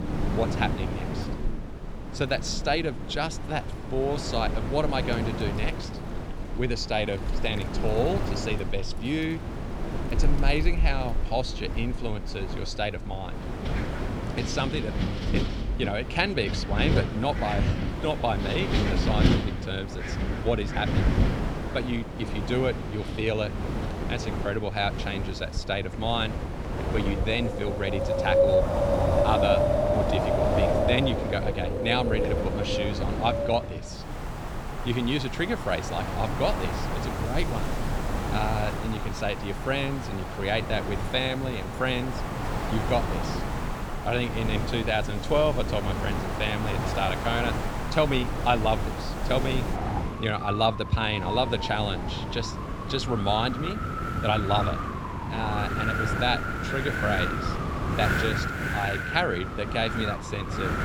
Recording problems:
wind in the background; loud; throughout; 1 dB below the speech

